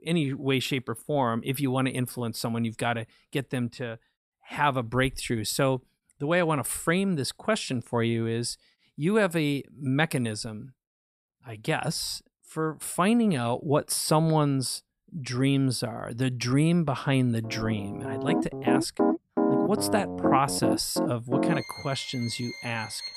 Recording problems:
background music; loud; from 18 s on; 1 dB below the speech

